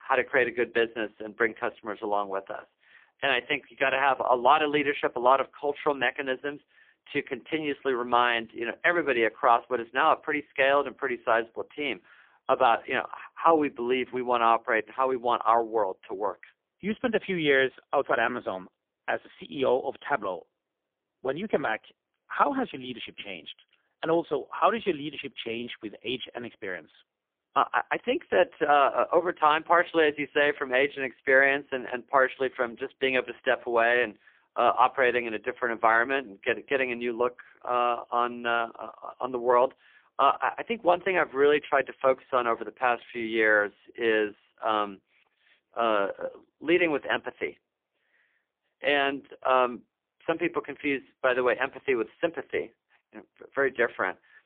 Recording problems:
phone-call audio; poor line; nothing above 3.5 kHz

